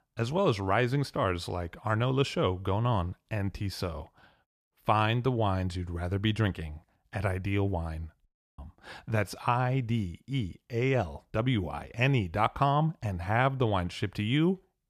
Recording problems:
audio cutting out; at 8.5 s

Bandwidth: 14.5 kHz